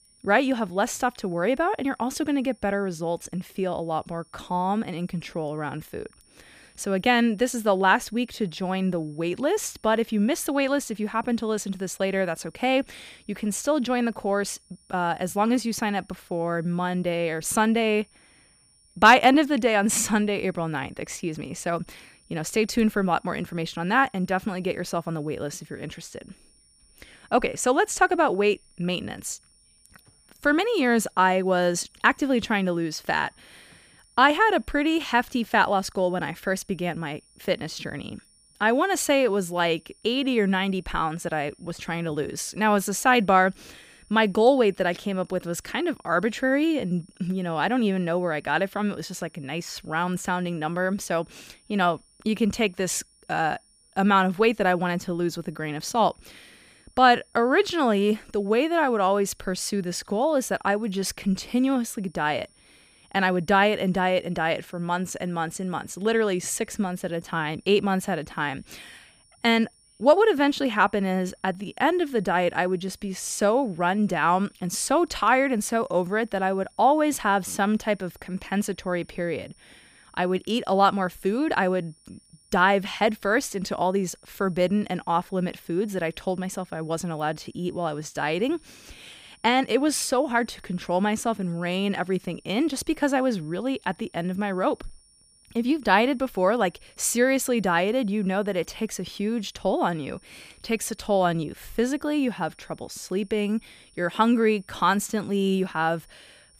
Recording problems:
high-pitched whine; faint; throughout; 9.5 kHz, 30 dB below the speech

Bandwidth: 15 kHz